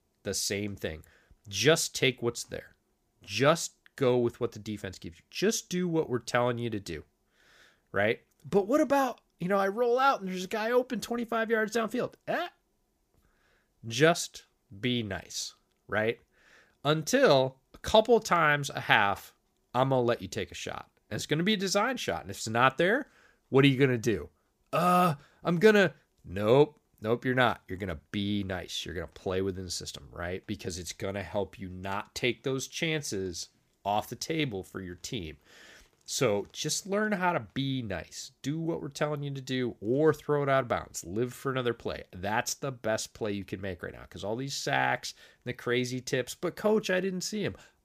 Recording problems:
none

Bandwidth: 15 kHz